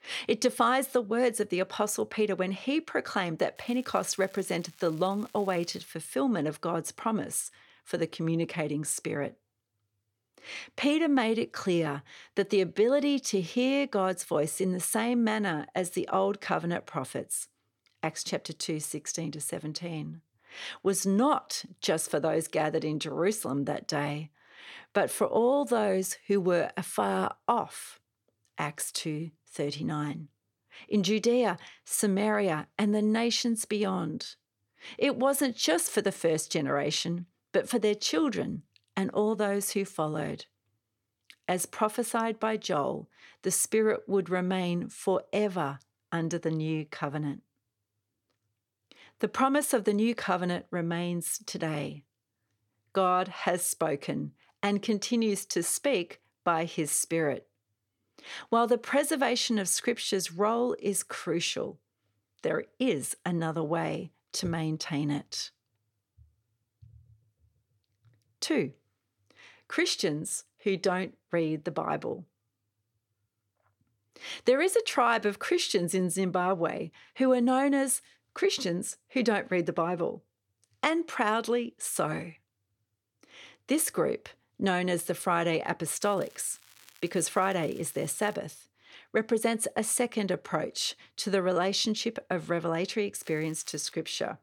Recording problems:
crackling; faint; from 3.5 to 6 s, from 1:26 to 1:28 and at 1:33; 25 dB below the speech

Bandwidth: 17.5 kHz